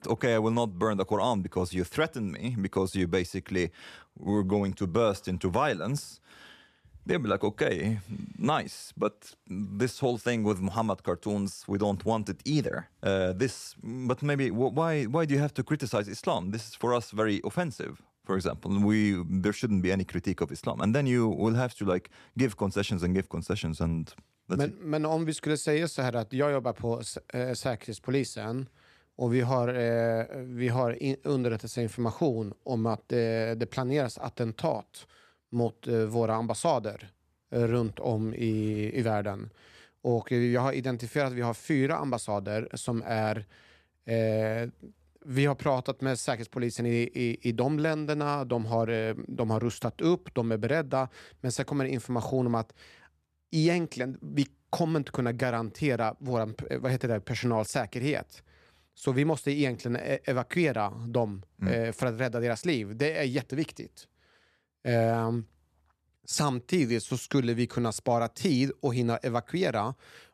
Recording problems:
none

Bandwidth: 14 kHz